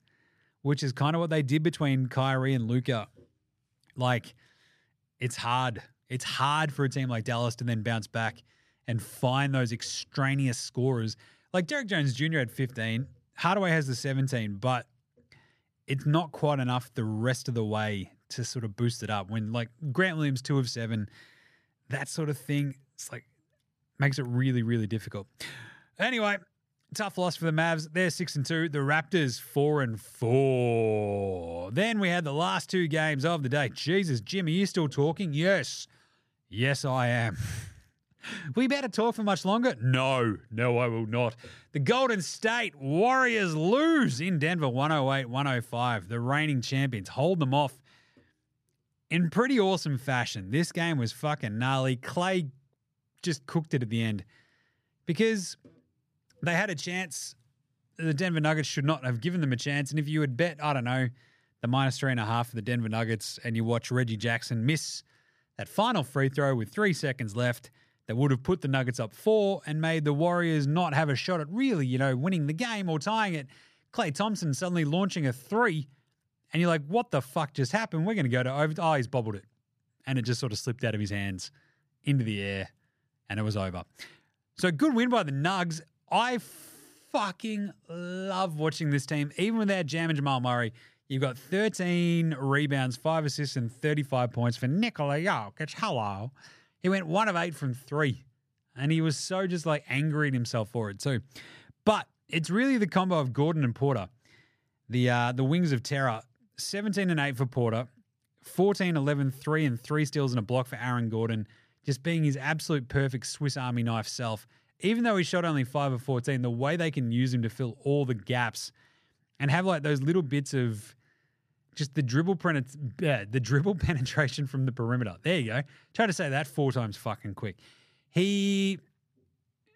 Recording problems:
none

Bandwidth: 15 kHz